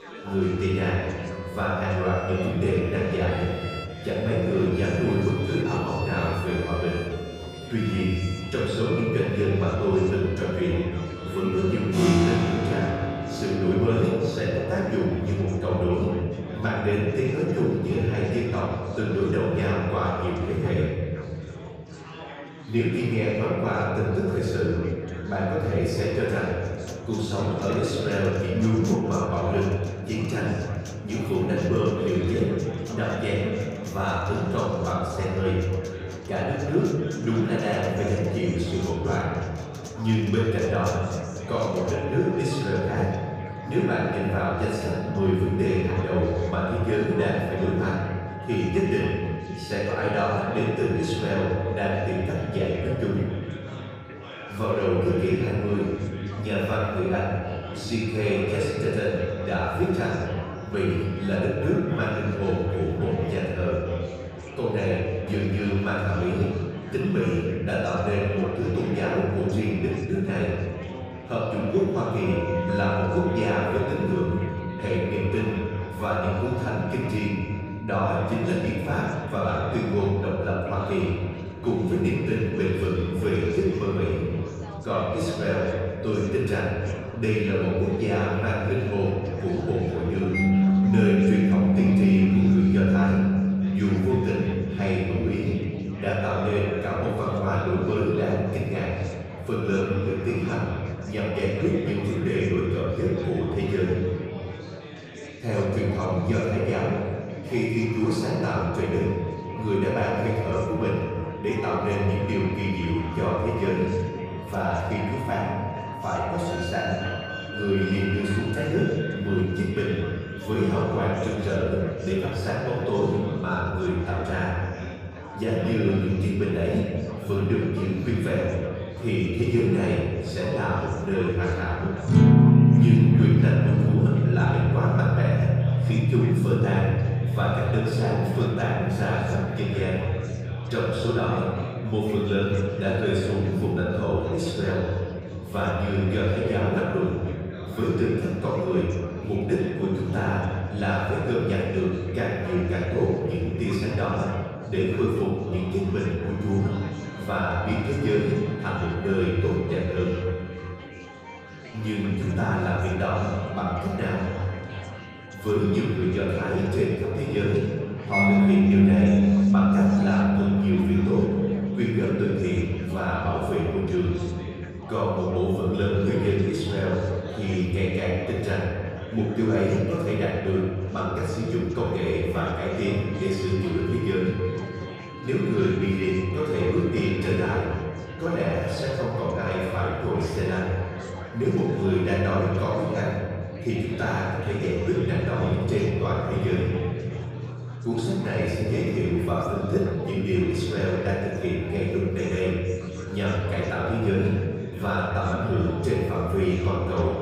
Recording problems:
room echo; strong; dies away in 1.9 s
off-mic speech; far
background music; loud; throughout; 1 dB below the speech
chatter from many people; noticeable; throughout; 15 dB below the speech

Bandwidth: 15.5 kHz